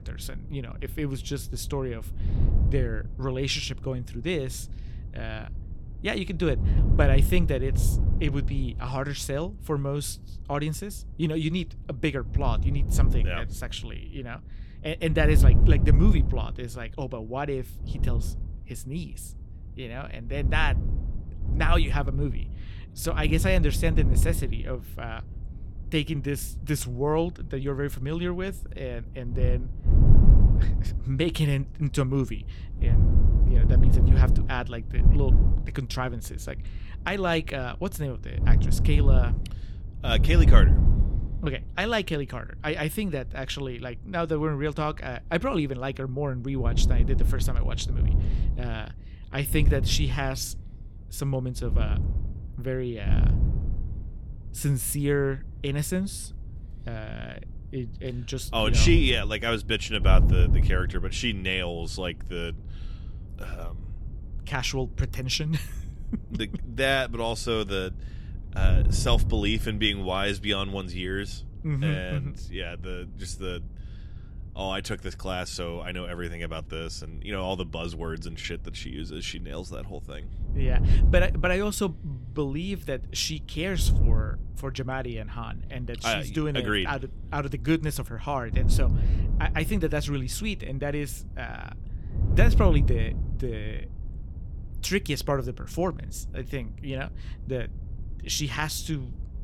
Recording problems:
wind noise on the microphone; occasional gusts; 10 dB below the speech

